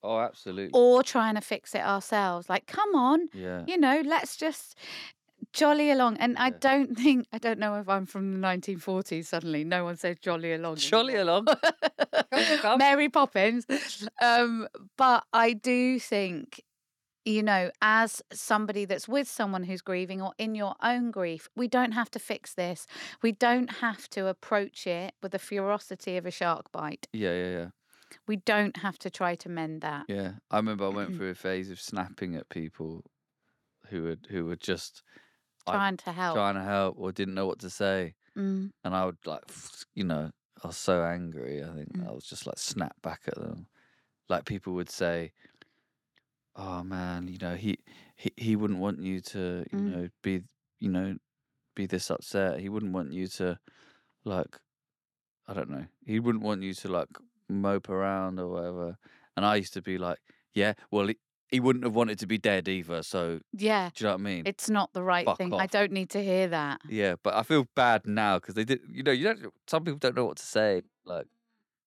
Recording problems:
none

